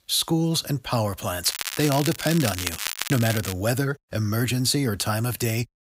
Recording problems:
crackling; loud; from 1.5 to 3.5 s; 6 dB below the speech

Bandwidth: 15.5 kHz